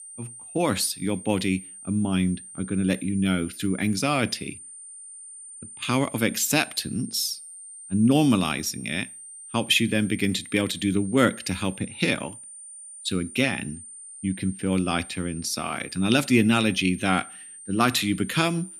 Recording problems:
high-pitched whine; noticeable; throughout; 9 kHz, 15 dB below the speech

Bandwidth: 14.5 kHz